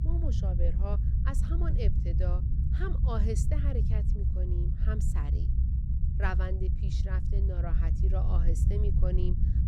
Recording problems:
low rumble; loud; throughout; 4 dB below the speech

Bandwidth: 18.5 kHz